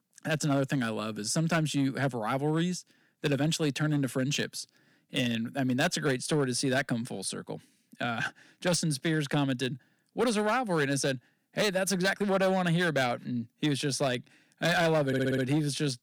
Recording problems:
distortion; slight; 5% of the sound clipped
uneven, jittery; slightly; from 3 to 12 s
audio stuttering; at 15 s

